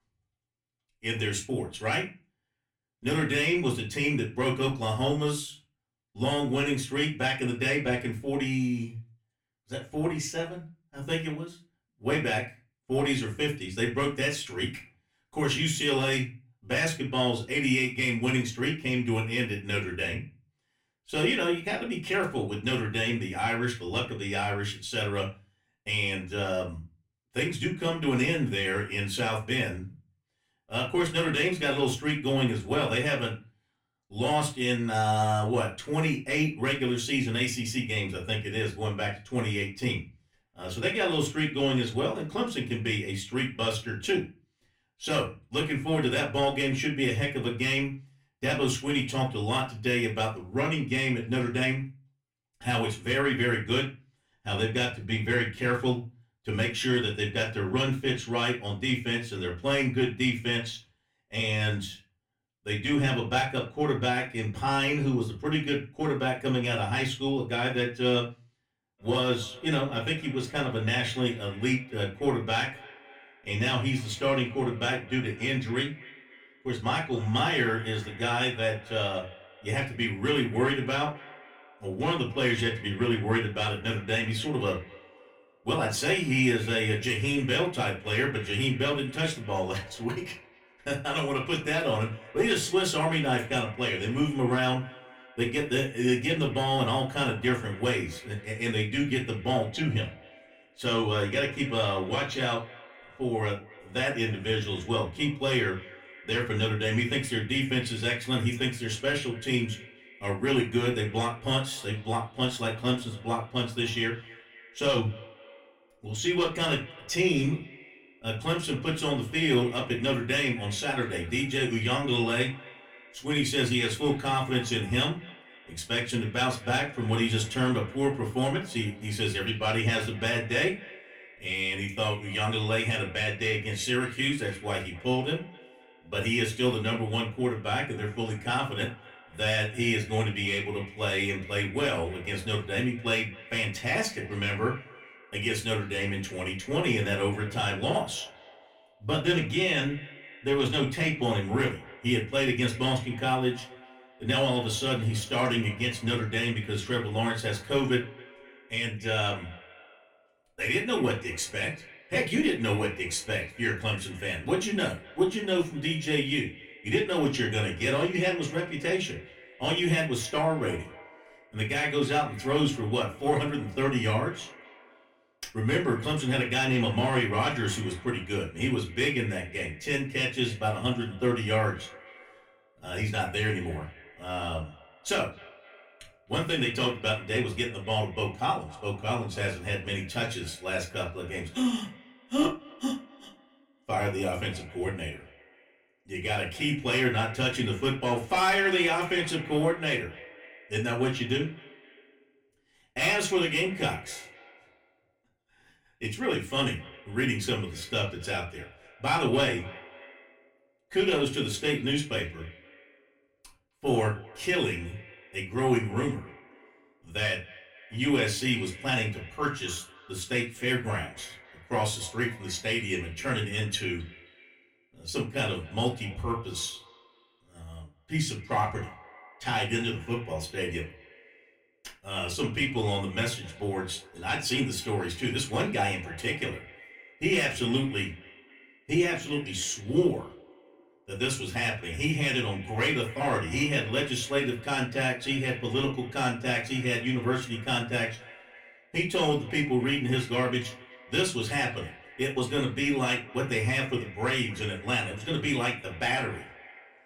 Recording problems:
off-mic speech; far
echo of what is said; faint; from 1:09 on; 260 ms later, 20 dB below the speech
room echo; very slight; dies away in 0.3 s

